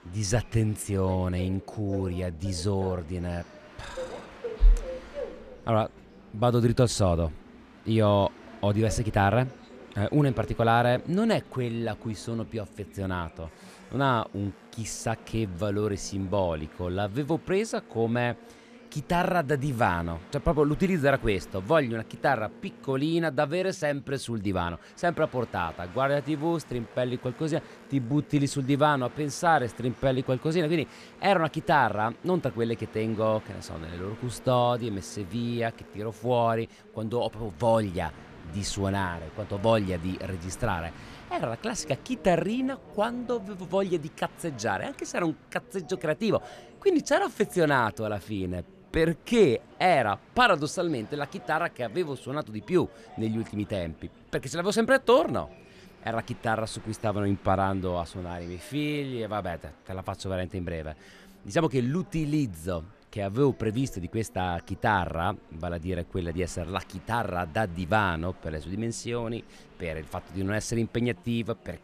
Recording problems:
train or aircraft noise; faint; throughout; 20 dB below the speech
chatter from many people; faint; throughout; 25 dB below the speech

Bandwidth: 14.5 kHz